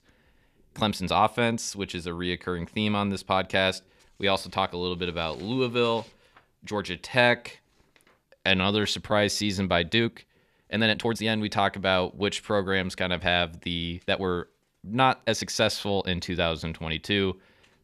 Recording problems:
uneven, jittery; strongly; from 0.5 to 16 s

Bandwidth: 14.5 kHz